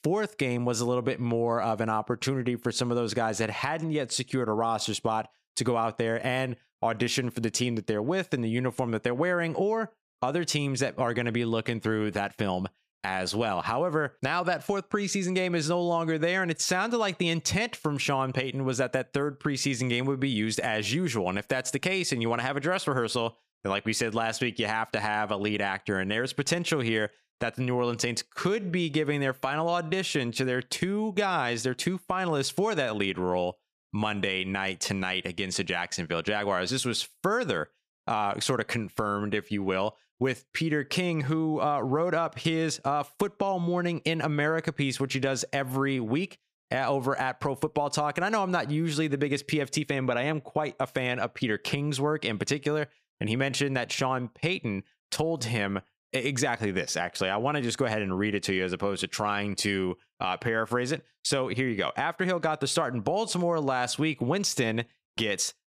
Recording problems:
squashed, flat; somewhat

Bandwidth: 15 kHz